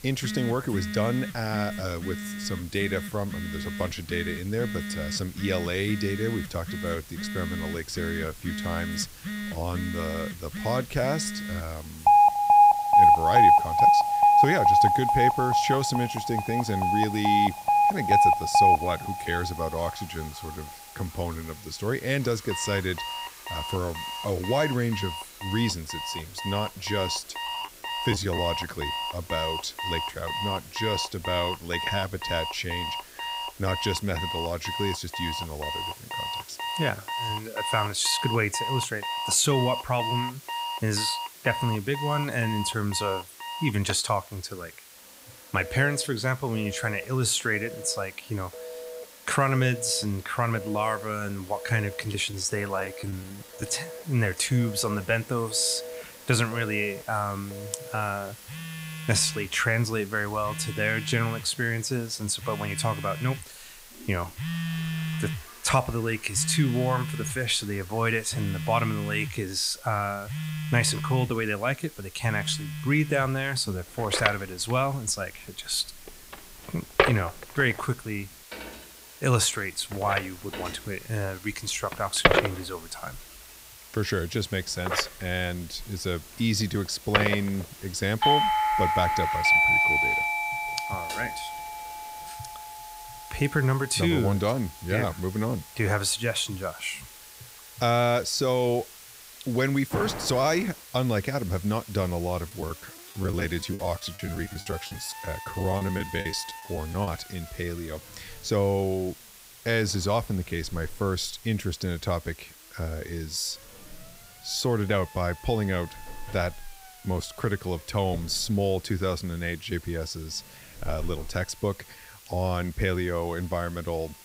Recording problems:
alarms or sirens; very loud; throughout; 1 dB above the speech
hiss; noticeable; throughout; 15 dB below the speech
household noises; faint; throughout; 25 dB below the speech
choppy; very; at 28 s, from 52 to 54 s and from 1:42 to 1:47; 15% of the speech affected

